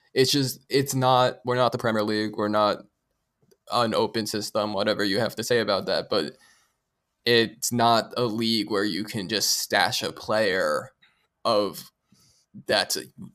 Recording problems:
uneven, jittery; strongly; from 0.5 to 13 s

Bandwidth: 14.5 kHz